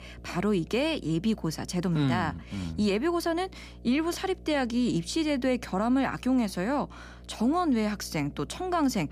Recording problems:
electrical hum; faint; throughout; 60 Hz, 30 dB below the speech

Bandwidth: 15 kHz